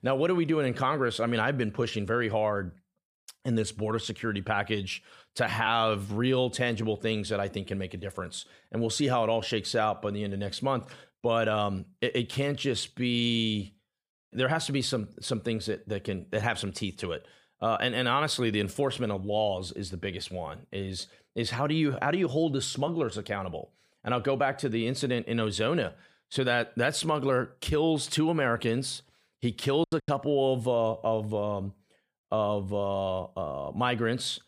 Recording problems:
choppy; very; at 30 s; 22% of the speech affected

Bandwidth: 15 kHz